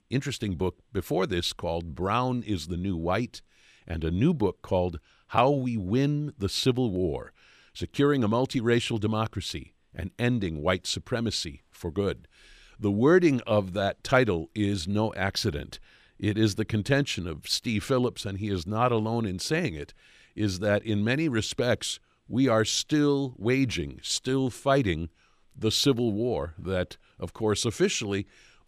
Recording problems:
none

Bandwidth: 14.5 kHz